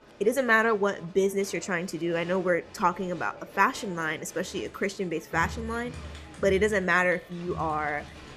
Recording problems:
crowd noise; noticeable; throughout; 15 dB below the speech

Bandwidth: 14 kHz